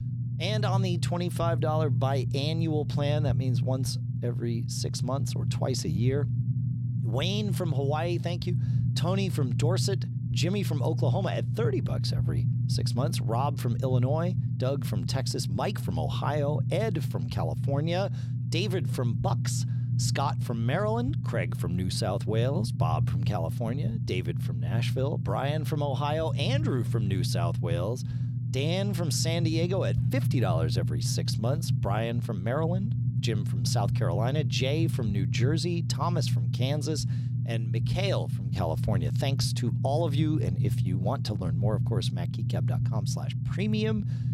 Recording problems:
low rumble; loud; throughout; 8 dB below the speech

